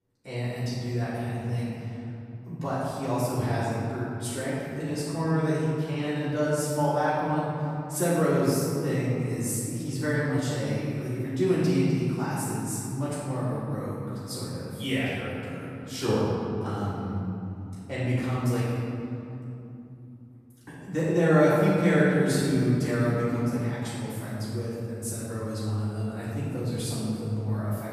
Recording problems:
room echo; strong; dies away in 3 s
off-mic speech; far

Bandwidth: 15 kHz